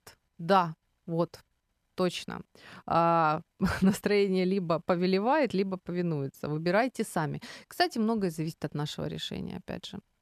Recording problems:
none

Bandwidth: 14 kHz